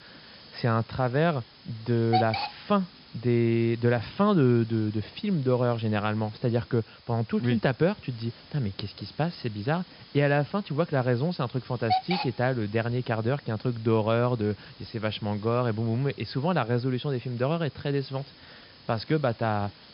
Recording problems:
high frequencies cut off; noticeable; nothing above 5.5 kHz
hiss; noticeable; throughout; 15 dB below the speech

